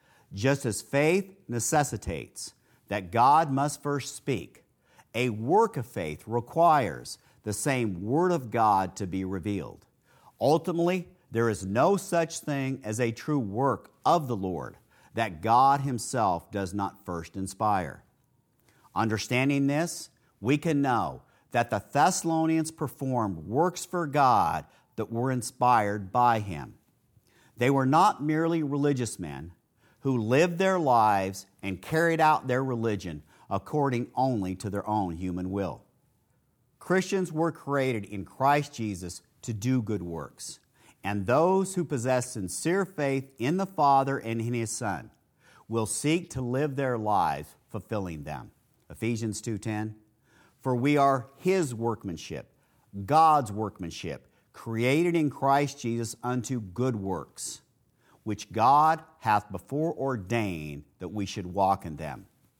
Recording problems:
none

